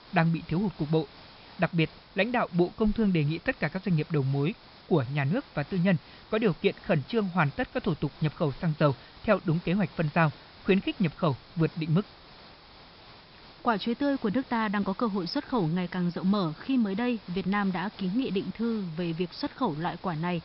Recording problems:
high frequencies cut off; noticeable; nothing above 5.5 kHz
hiss; faint; throughout; 20 dB below the speech

